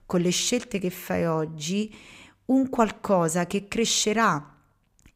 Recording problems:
none

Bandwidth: 15.5 kHz